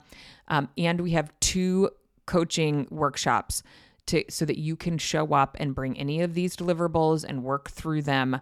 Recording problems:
none

